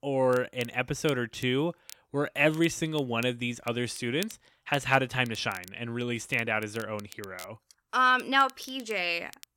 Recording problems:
crackle, like an old record; faint; 20 dB below the speech

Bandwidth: 16.5 kHz